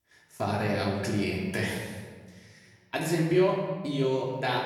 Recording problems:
off-mic speech; far
room echo; noticeable; dies away in 1.3 s

